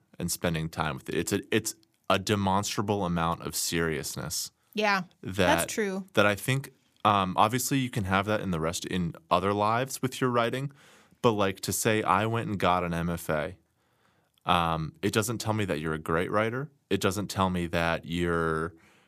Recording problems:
none

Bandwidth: 15 kHz